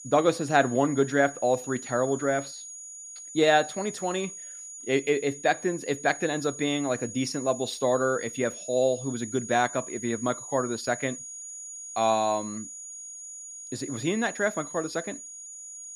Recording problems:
high-pitched whine; noticeable; throughout; 6.5 kHz, 10 dB below the speech

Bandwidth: 15 kHz